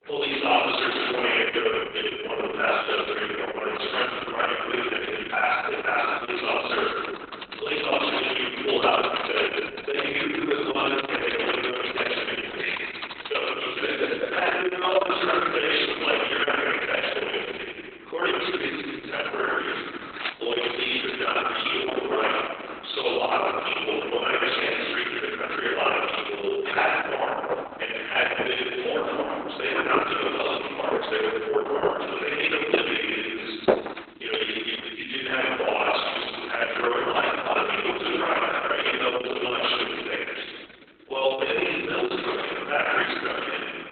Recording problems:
room echo; strong; dies away in 1.9 s
off-mic speech; far
garbled, watery; badly; nothing above 3.5 kHz
thin; very; fading below 350 Hz
keyboard typing; noticeable; from 7 to 13 s; peak 4 dB below the speech
footsteps; noticeable; from 20 to 23 s; peak 6 dB below the speech
footsteps; loud; from 27 to 34 s; peak 3 dB above the speech

